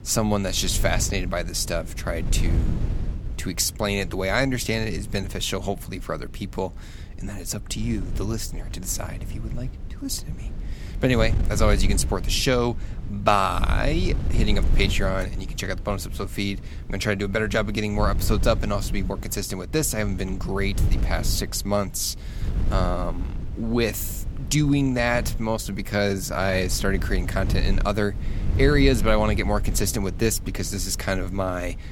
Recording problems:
wind noise on the microphone; occasional gusts; 15 dB below the speech

